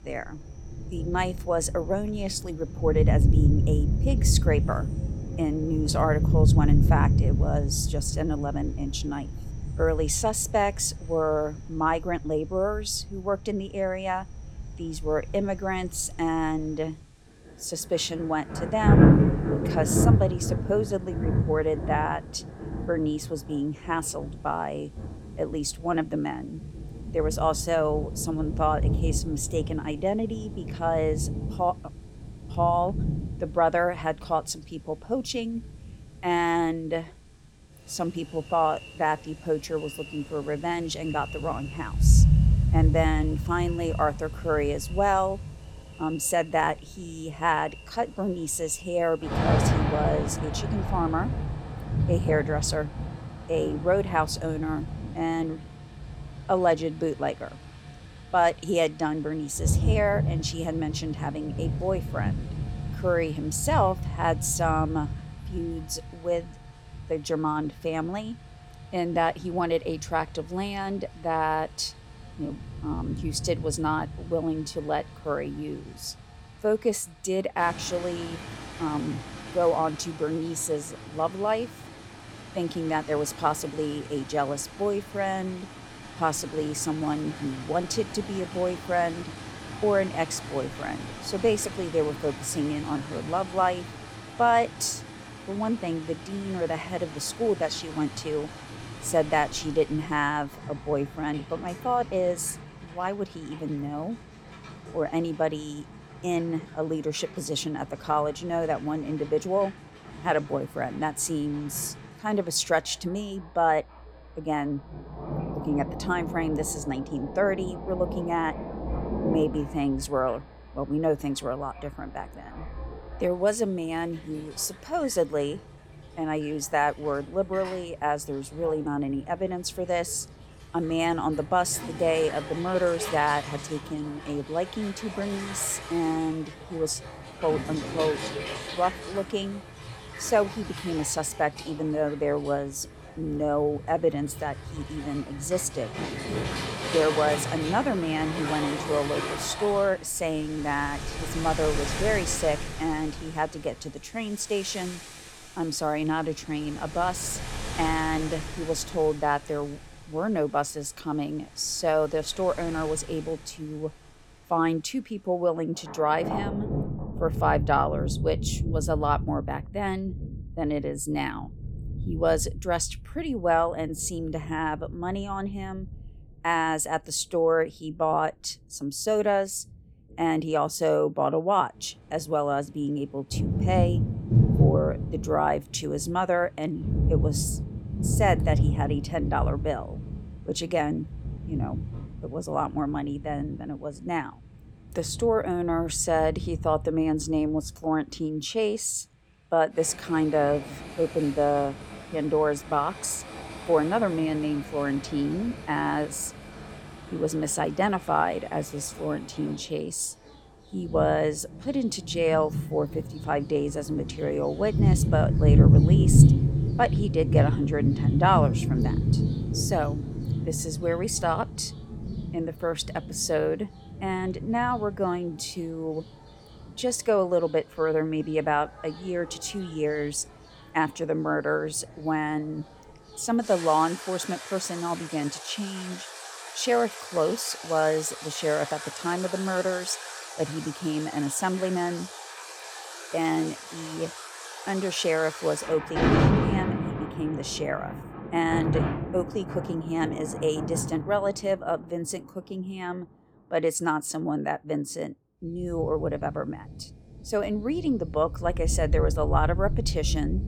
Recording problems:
rain or running water; loud; throughout; 2 dB below the speech

